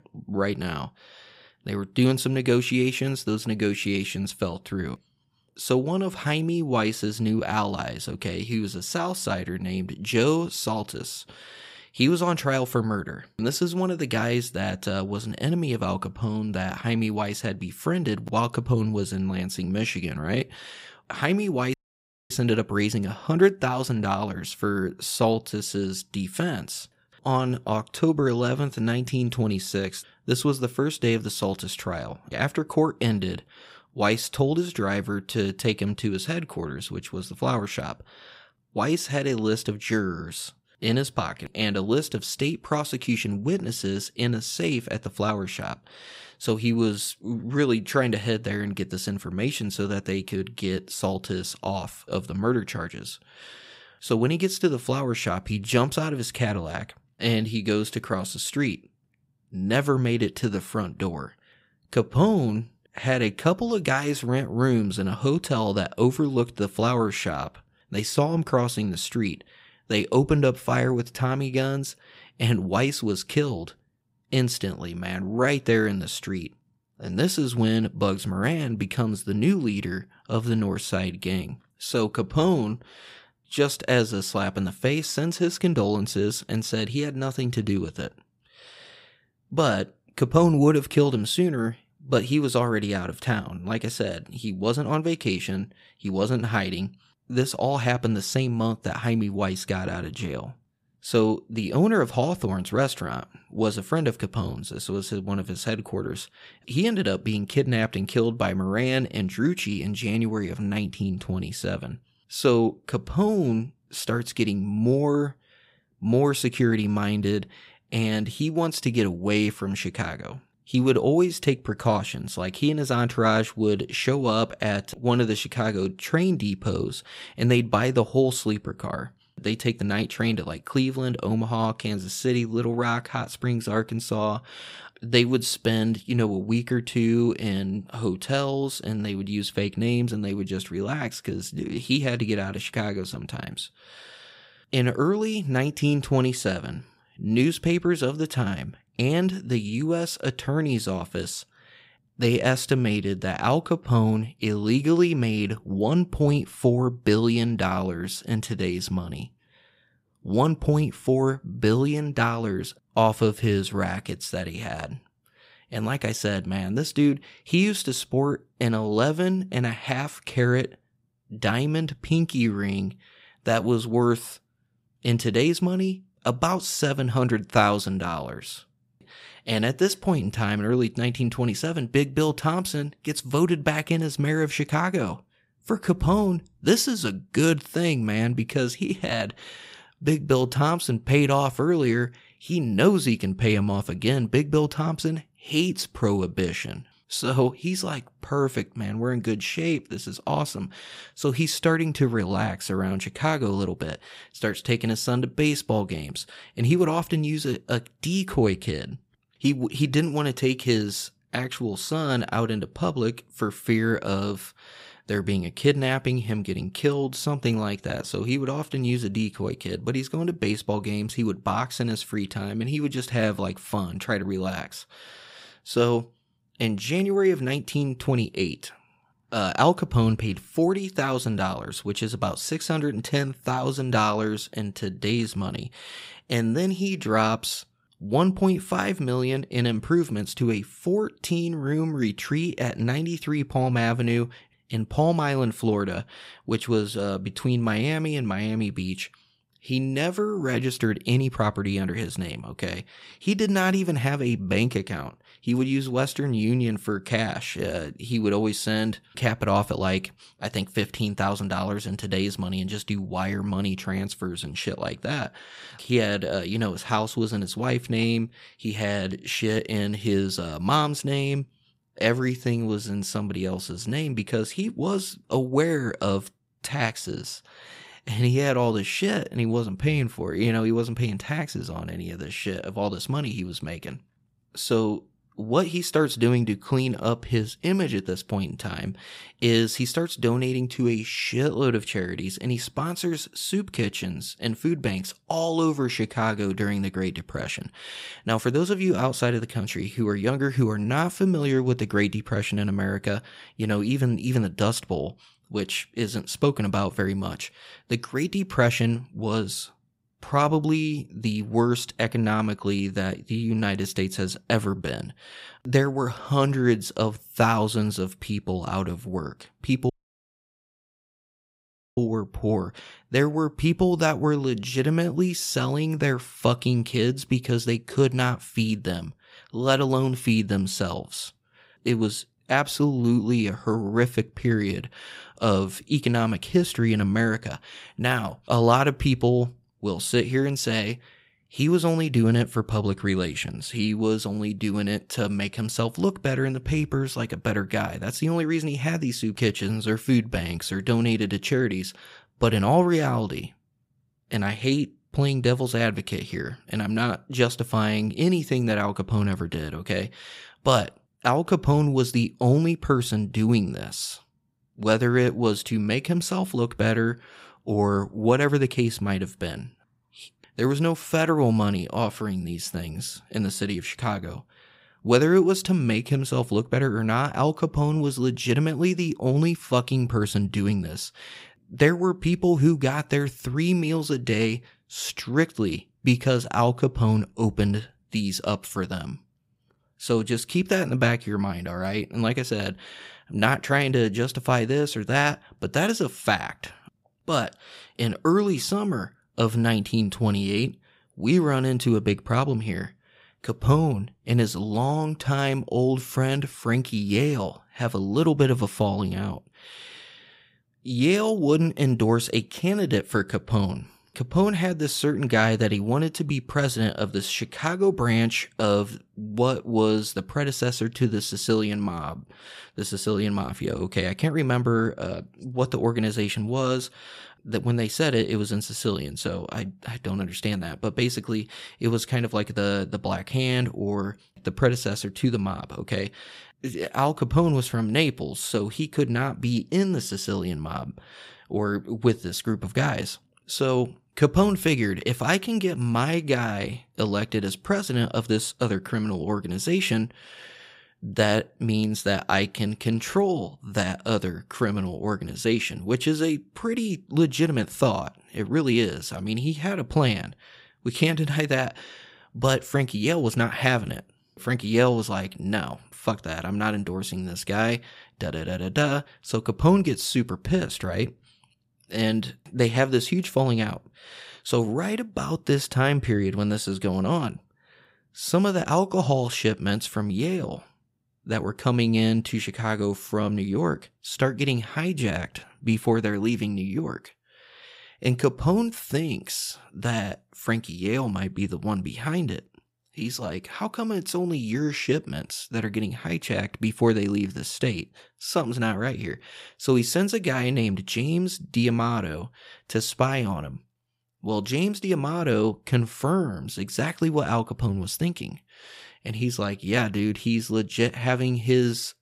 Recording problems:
audio cutting out; at 22 s for 0.5 s and at 5:20 for 2 s

